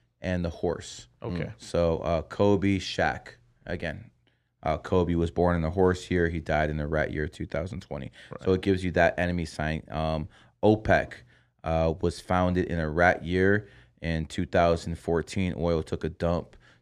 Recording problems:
none

